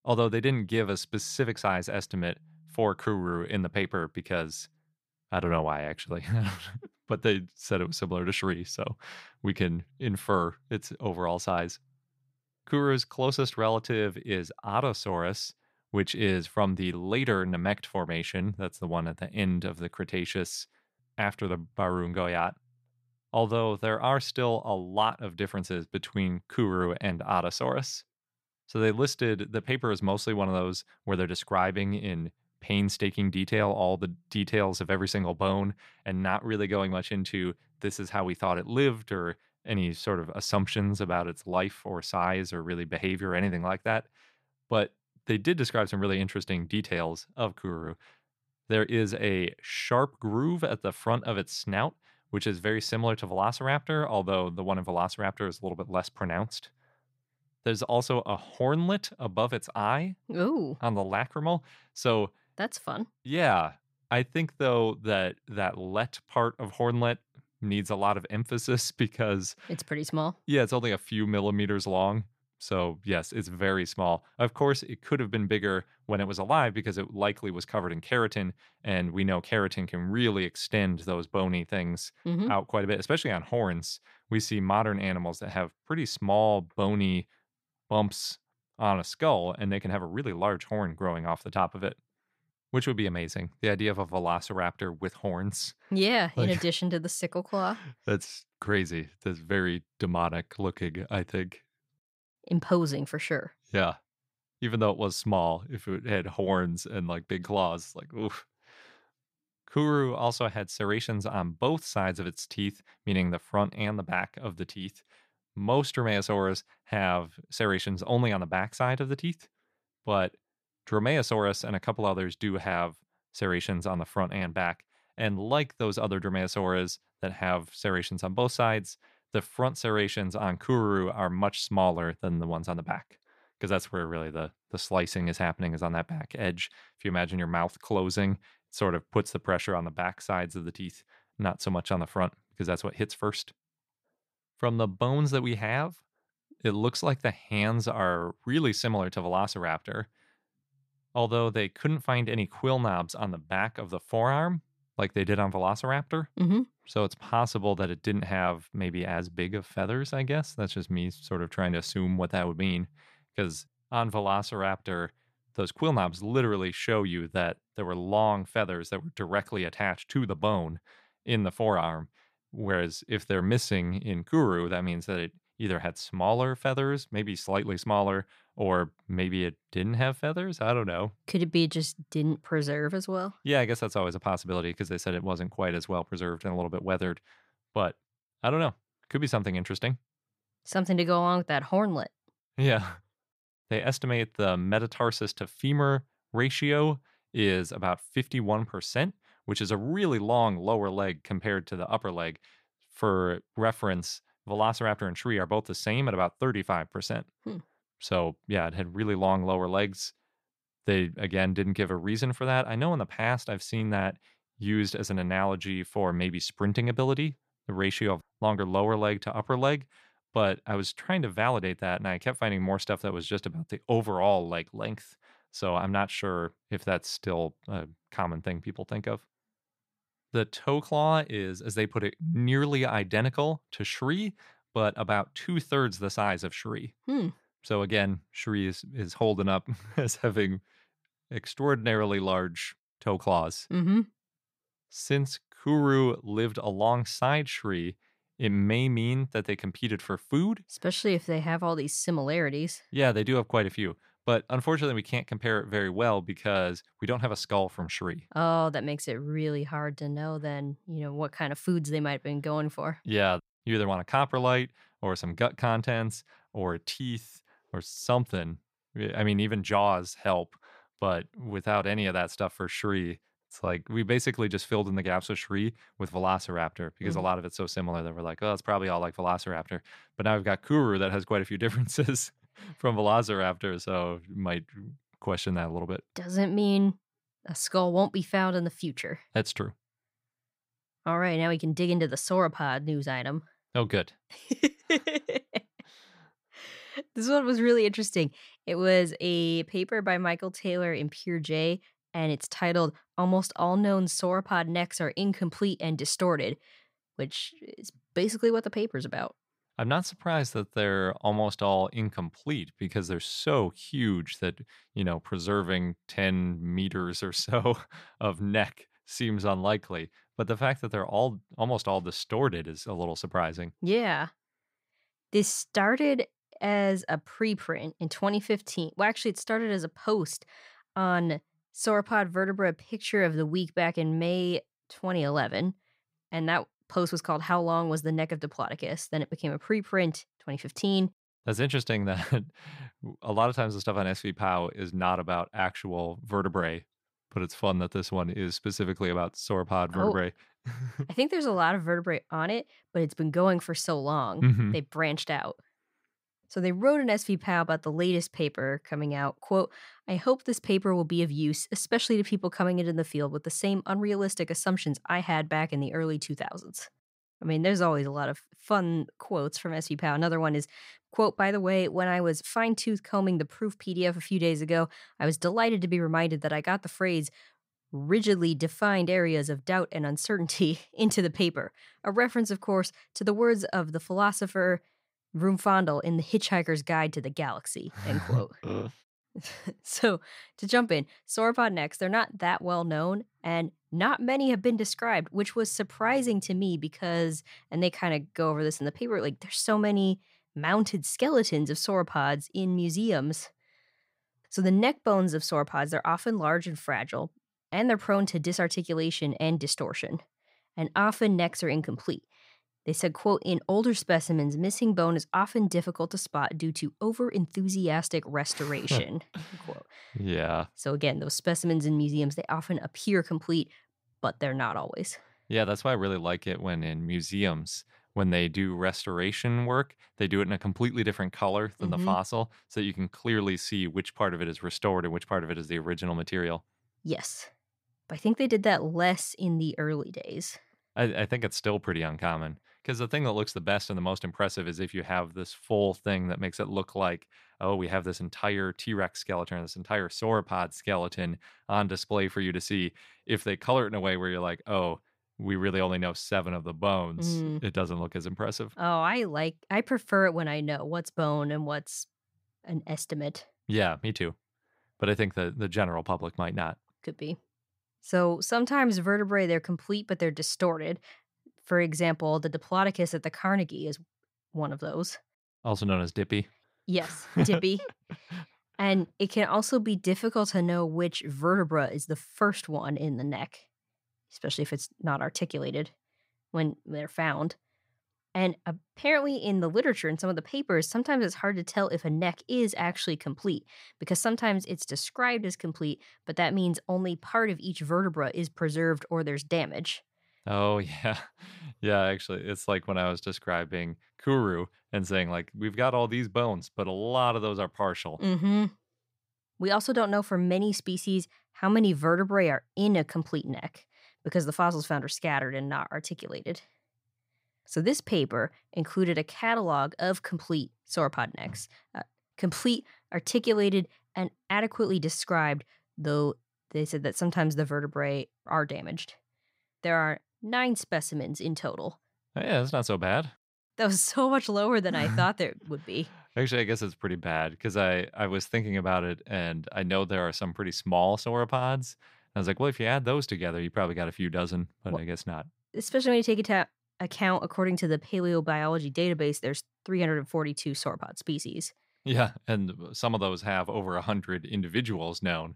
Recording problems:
none

